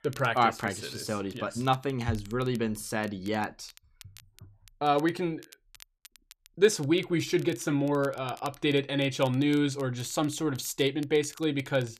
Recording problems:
crackle, like an old record; faint; 25 dB below the speech

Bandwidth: 14 kHz